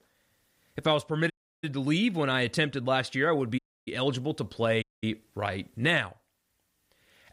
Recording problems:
audio cutting out; at 1.5 s, at 3.5 s and at 5 s

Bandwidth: 15.5 kHz